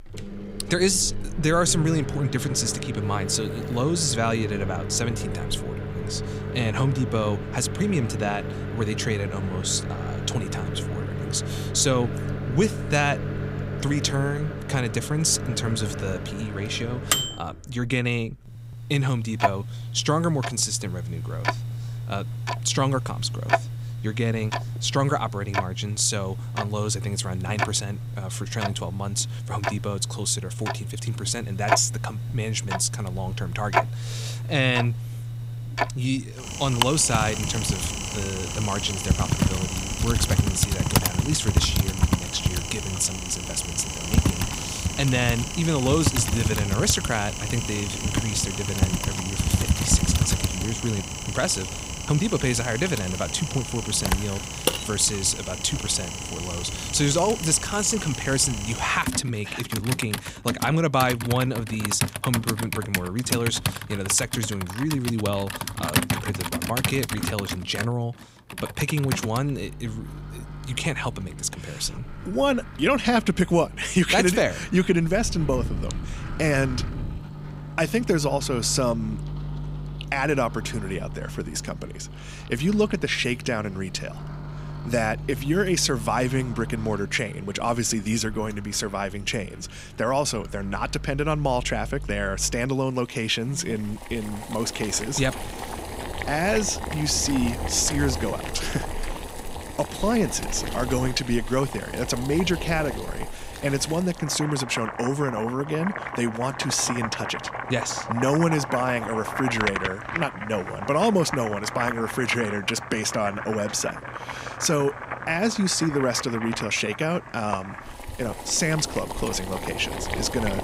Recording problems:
household noises; loud; throughout; 5 dB below the speech

